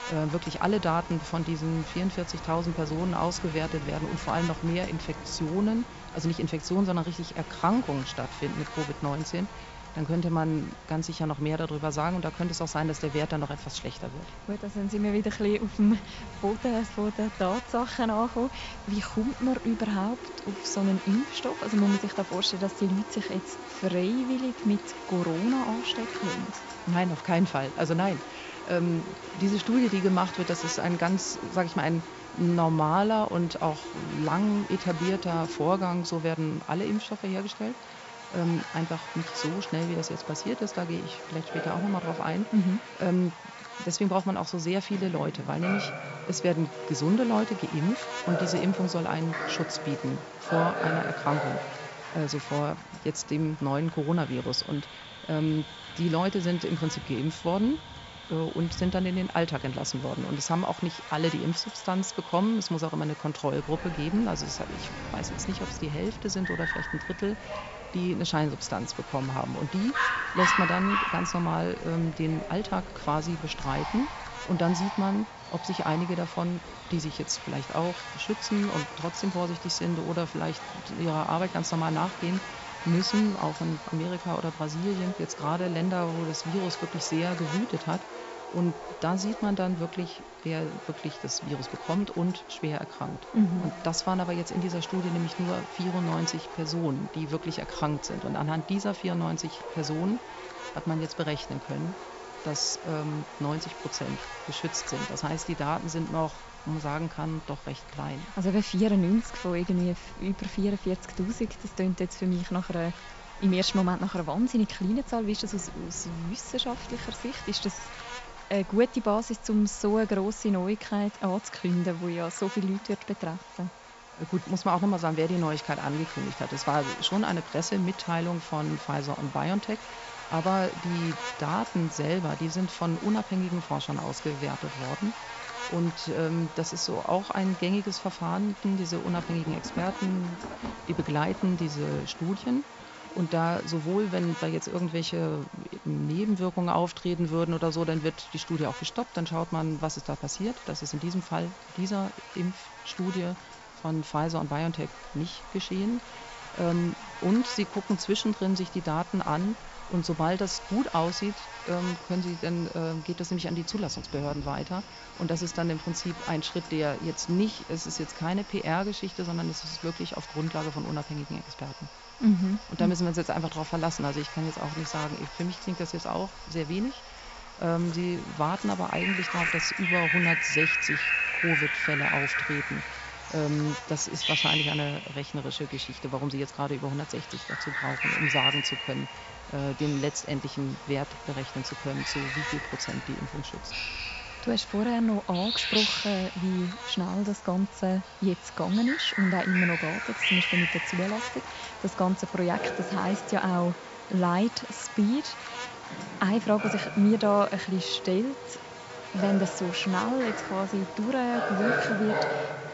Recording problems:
high frequencies cut off; noticeable; nothing above 8 kHz
electrical hum; loud; throughout; 60 Hz, 9 dB below the speech
animal sounds; loud; throughout; 5 dB below the speech
rain or running water; faint; from 52 s on; 25 dB below the speech

